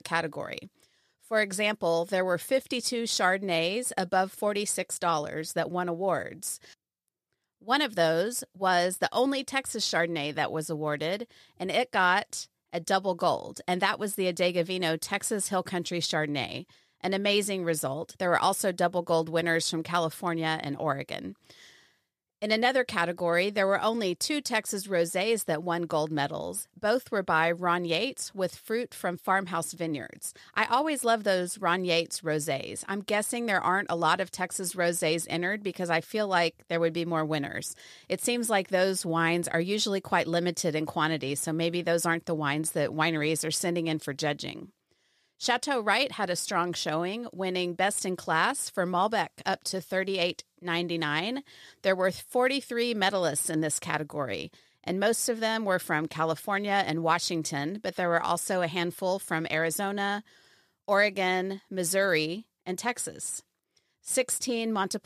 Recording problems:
none

